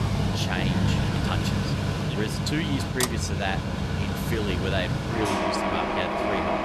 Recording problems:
machinery noise; very loud; throughout; 5 dB above the speech

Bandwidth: 13.5 kHz